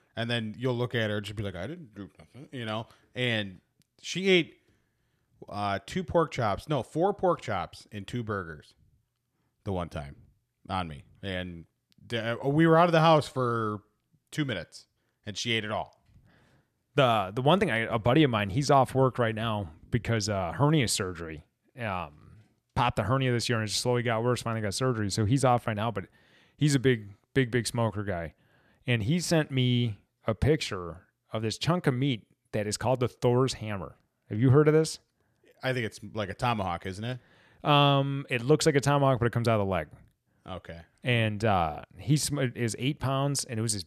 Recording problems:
none

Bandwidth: 14.5 kHz